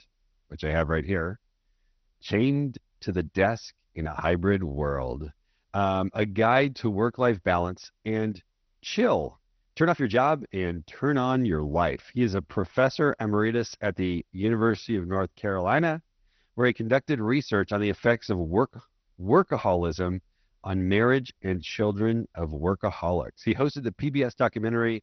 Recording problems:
garbled, watery; slightly; nothing above 6 kHz
uneven, jittery; strongly; from 2 to 22 s

